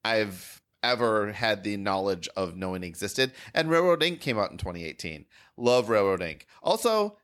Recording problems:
none

